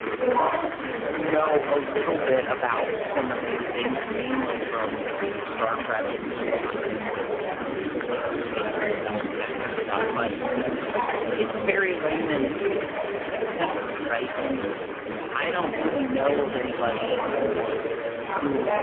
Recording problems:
phone-call audio; poor line; nothing above 3 kHz
murmuring crowd; loud; throughout; as loud as the speech
household noises; very faint; throughout; 30 dB below the speech

